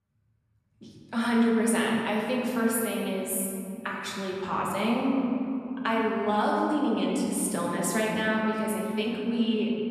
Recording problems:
off-mic speech; far
room echo; noticeable; dies away in 2.6 s

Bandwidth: 13.5 kHz